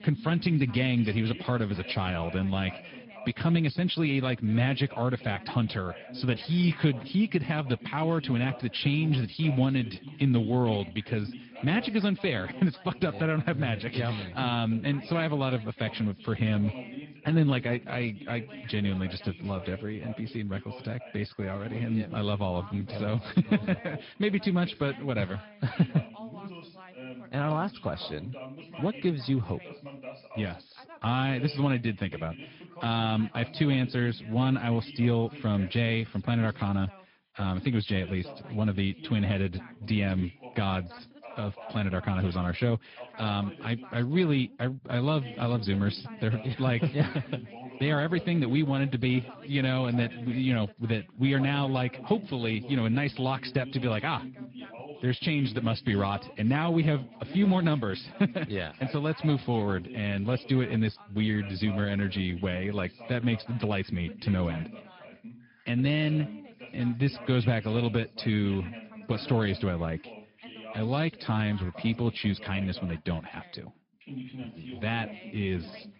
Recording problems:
high frequencies cut off; noticeable; nothing above 5 kHz
garbled, watery; slightly
background chatter; noticeable; throughout; 2 voices, 15 dB below the speech

